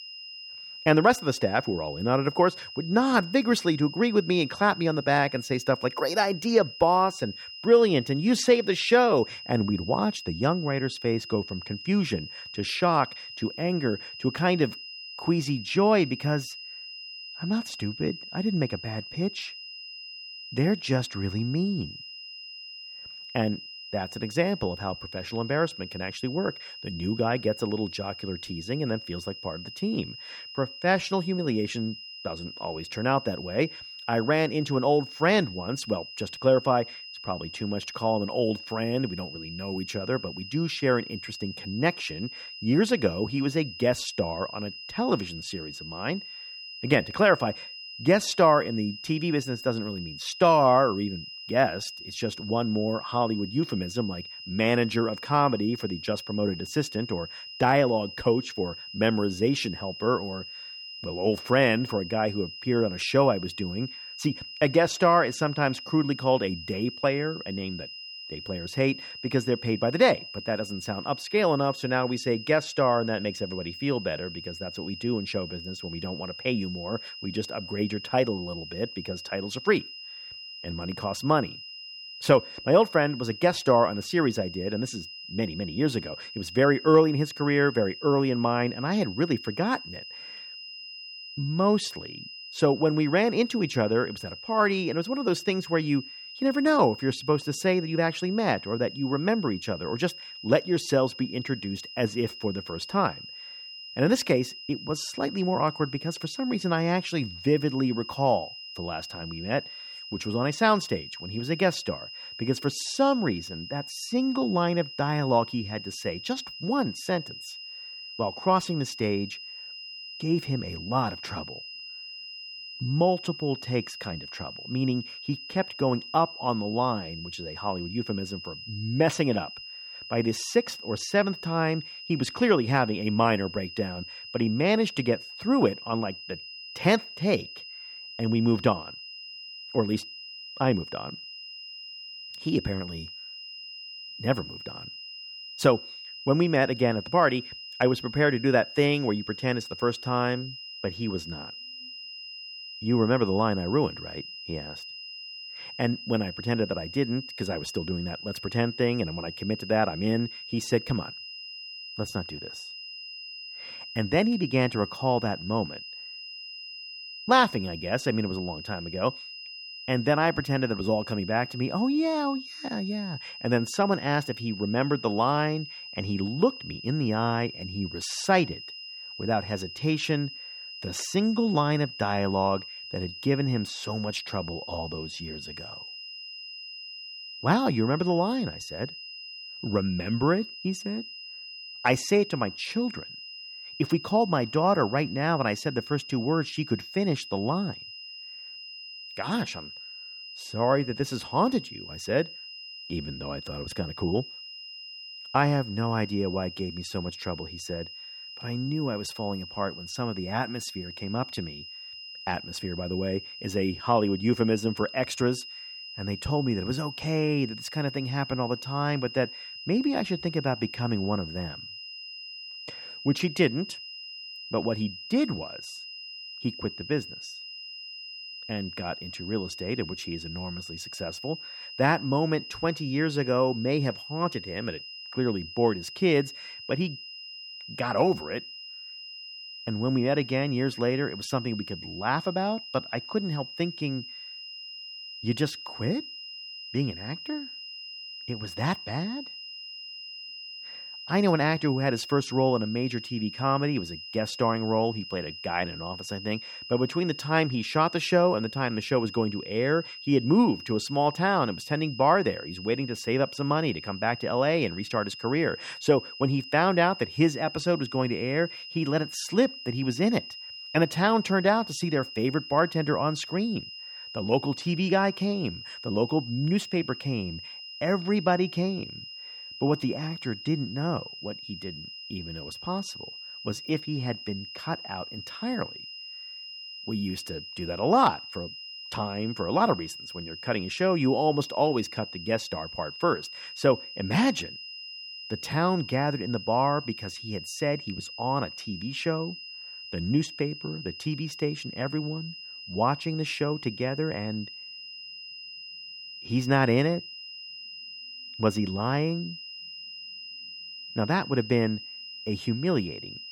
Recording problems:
high-pitched whine; noticeable; throughout; 5 kHz, 10 dB below the speech

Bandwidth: 17.5 kHz